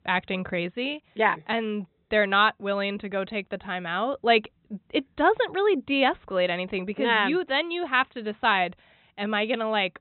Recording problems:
high frequencies cut off; severe; nothing above 4 kHz

